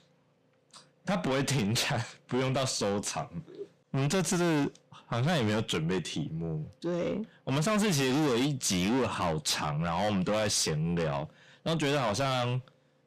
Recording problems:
distortion; heavy; 6 dB below the speech

